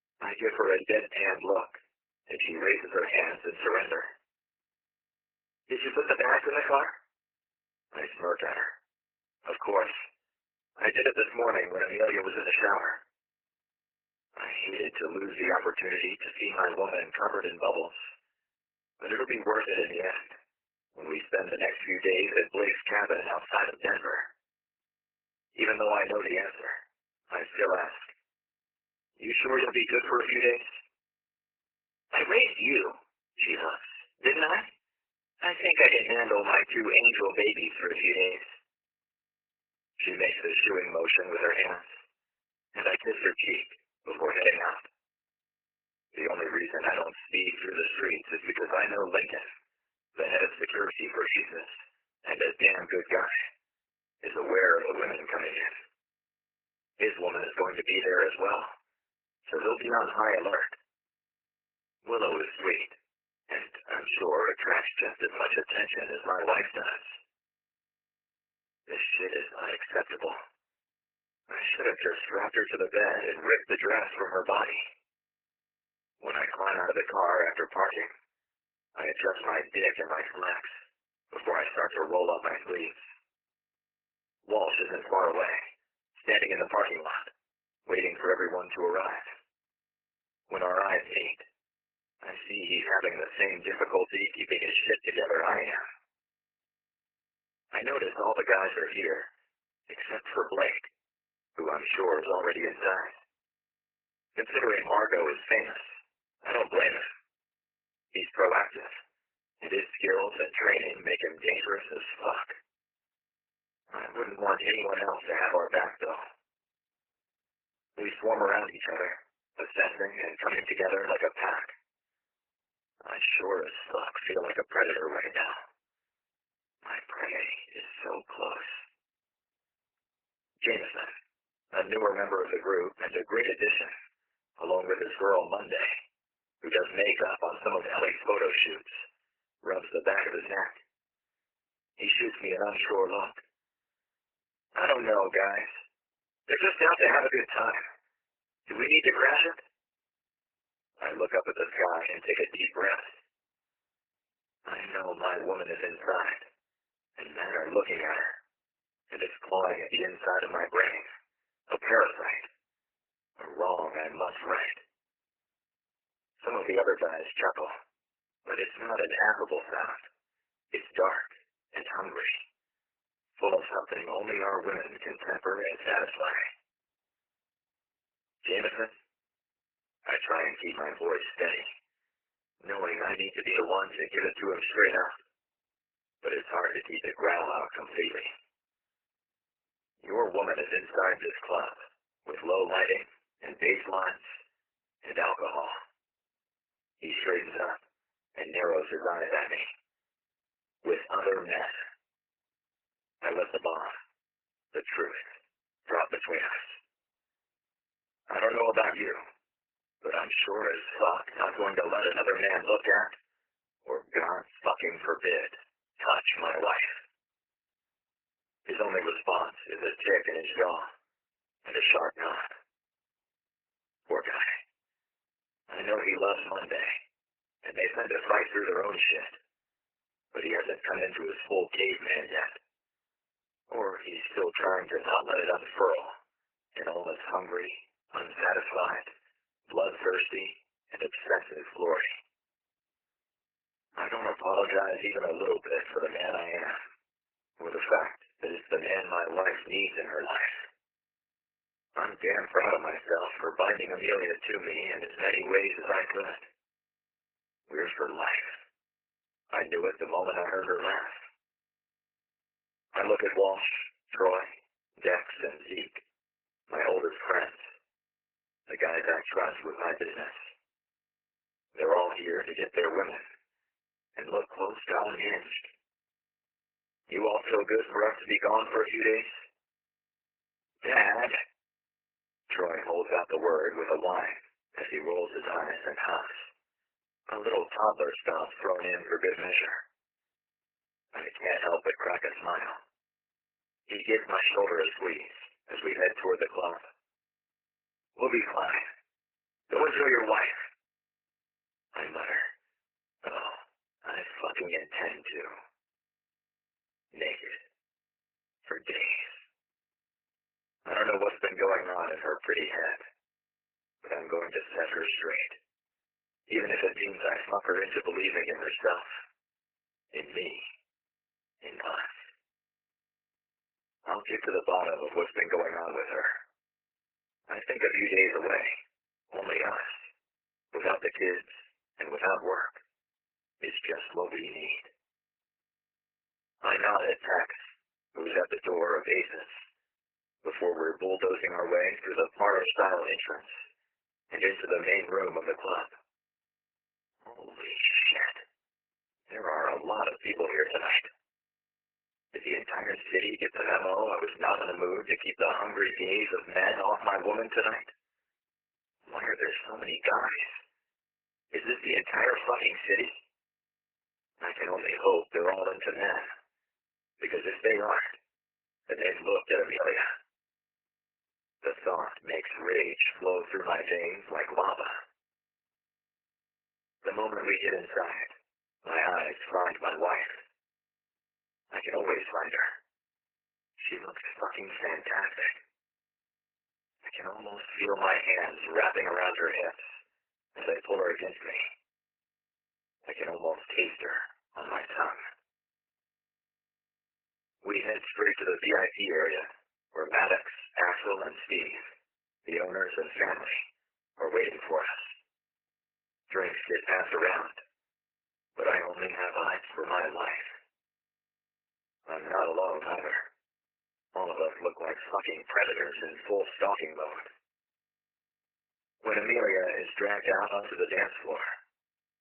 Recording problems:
garbled, watery; badly; nothing above 3 kHz
thin; very; fading below 350 Hz

